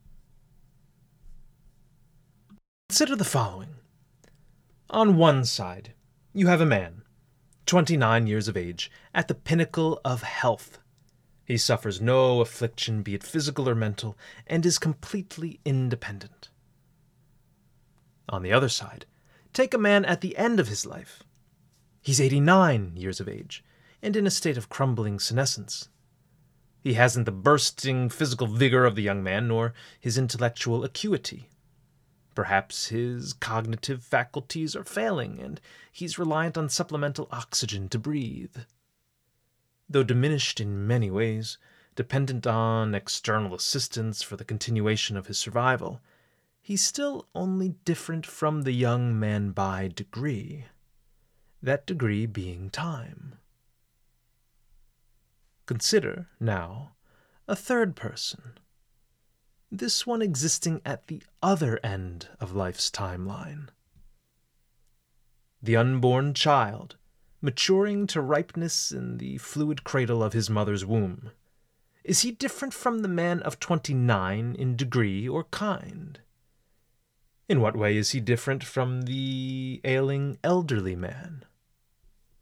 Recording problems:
none

